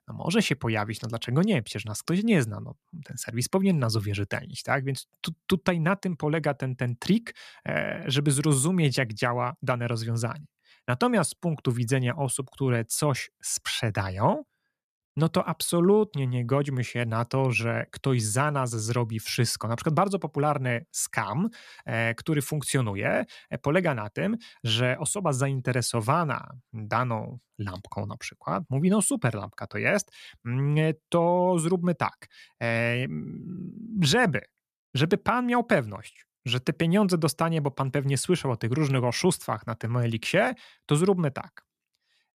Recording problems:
none

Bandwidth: 14.5 kHz